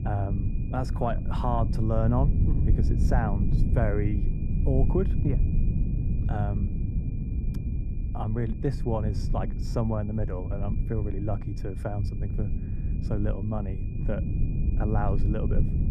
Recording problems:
muffled; very; fading above 1.5 kHz
low rumble; loud; throughout; 8 dB below the speech
high-pitched whine; faint; throughout; 2.5 kHz, 30 dB below the speech

